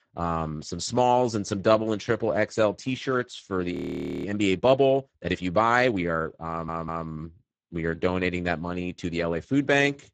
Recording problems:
garbled, watery; badly; nothing above 8 kHz
audio freezing; at 3.5 s for 0.5 s
audio stuttering; at 6.5 s

